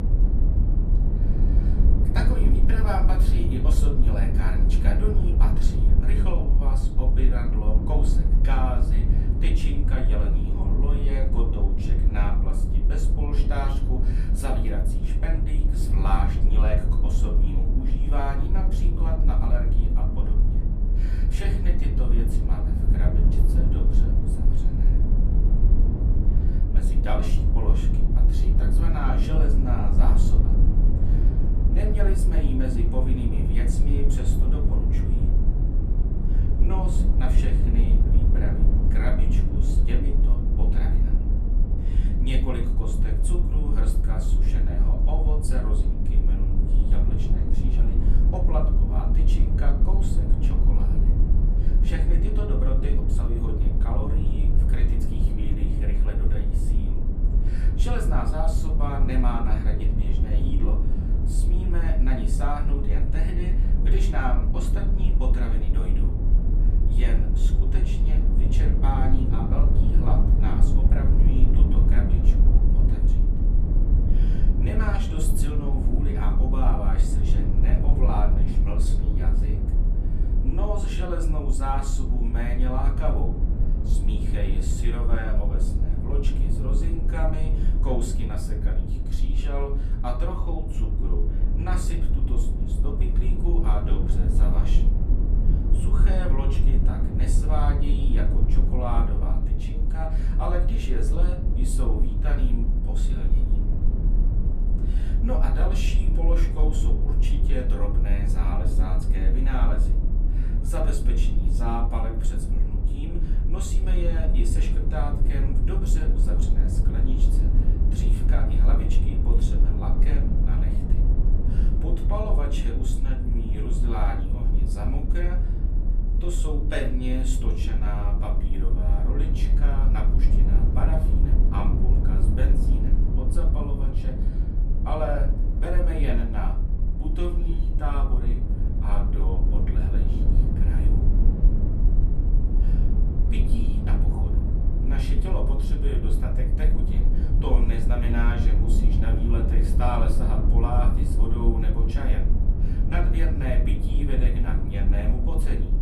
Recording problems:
off-mic speech; far
room echo; very slight; dies away in 0.4 s
low rumble; loud; throughout; 3 dB below the speech

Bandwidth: 14 kHz